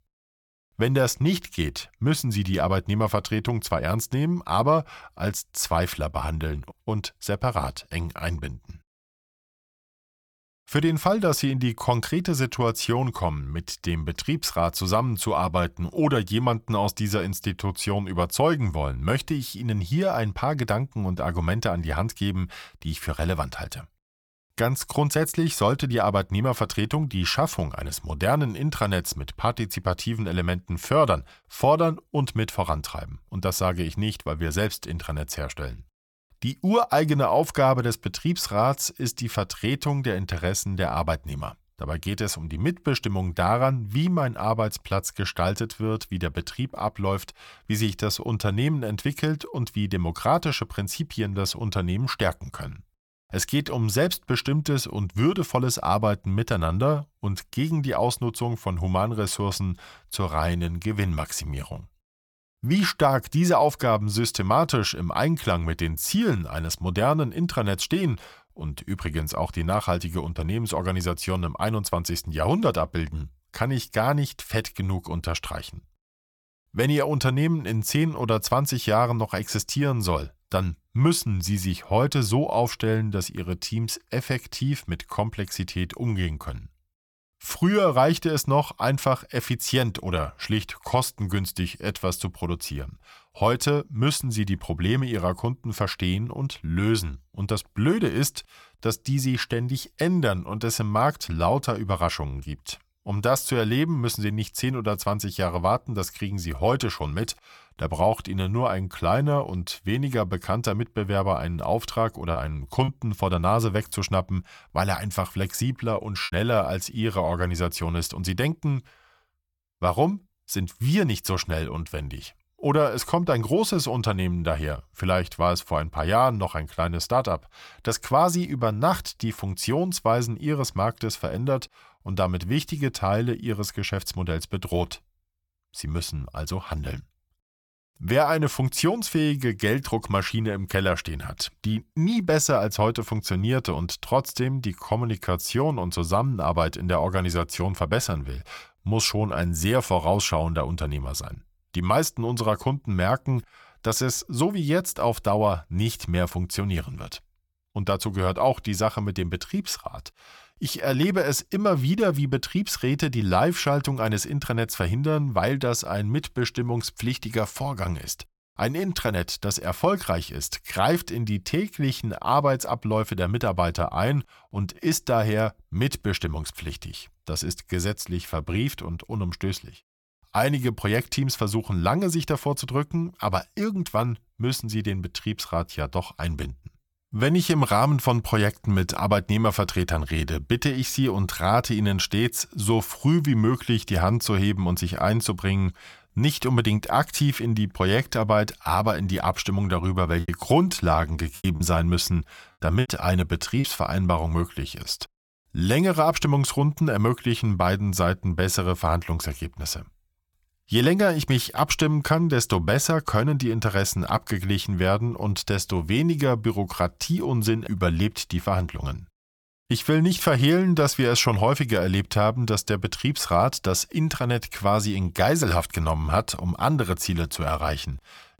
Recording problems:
choppy; occasionally; from 1:52 to 1:56 and from 3:20 to 3:24; 5% of the speech affected

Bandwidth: 18 kHz